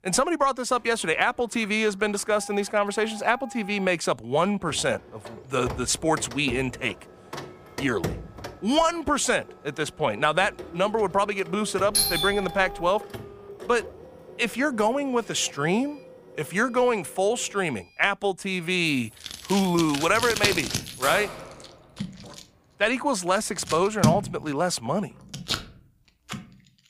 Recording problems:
household noises; loud; throughout; 10 dB below the speech
doorbell; loud; at 12 s; peak 4 dB above the speech
jangling keys; noticeable; from 19 to 22 s; peak 6 dB below the speech

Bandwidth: 15 kHz